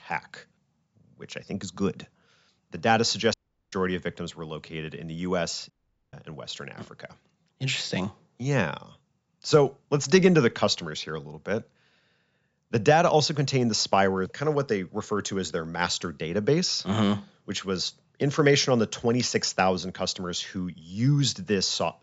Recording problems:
high frequencies cut off; noticeable; nothing above 8 kHz
audio cutting out; at 3.5 s and at 5.5 s

